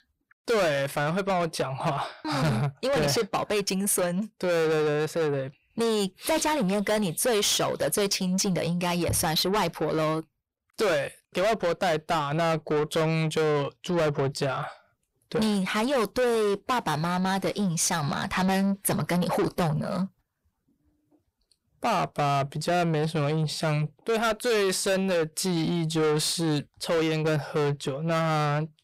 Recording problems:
distortion; heavy; 6 dB below the speech

